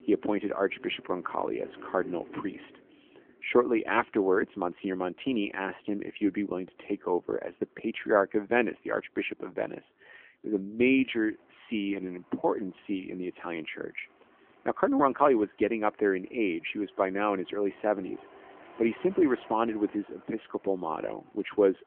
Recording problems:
phone-call audio; nothing above 3 kHz
traffic noise; faint; throughout; 25 dB below the speech

